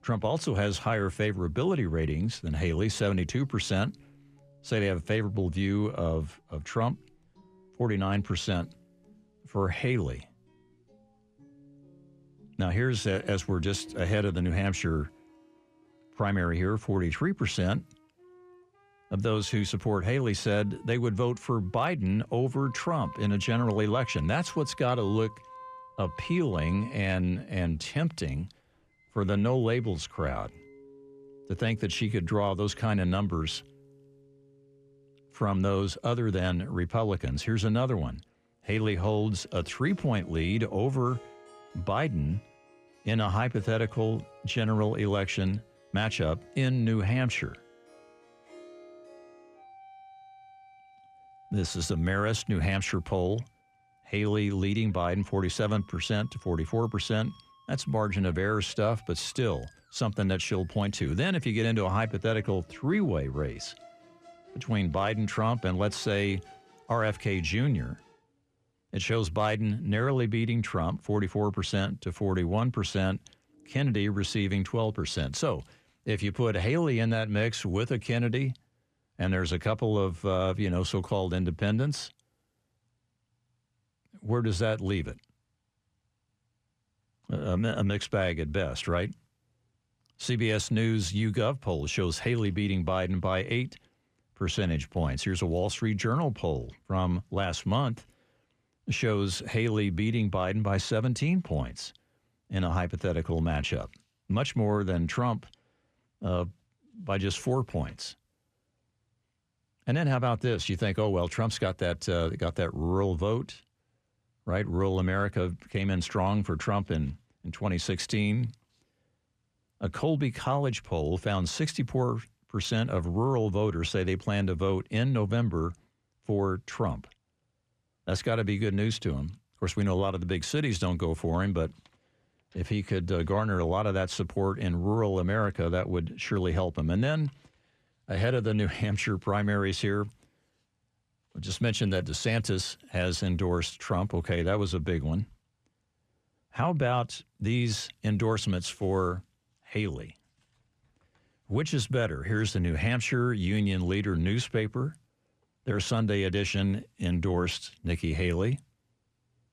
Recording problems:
background music; faint; until 1:15; 25 dB below the speech

